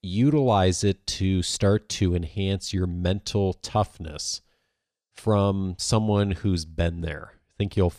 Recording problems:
none

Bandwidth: 14.5 kHz